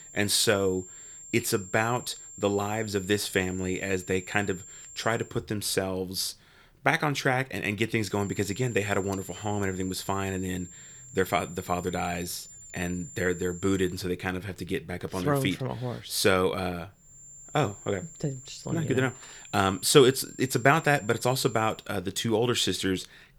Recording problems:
high-pitched whine; noticeable; until 5.5 s, from 8 to 14 s and from 17 to 22 s; 7.5 kHz, 15 dB below the speech

